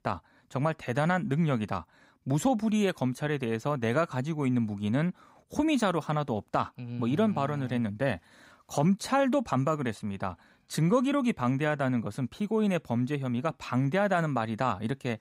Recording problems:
none

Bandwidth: 15.5 kHz